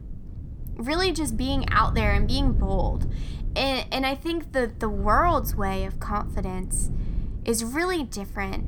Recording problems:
low rumble; noticeable; throughout; 20 dB below the speech

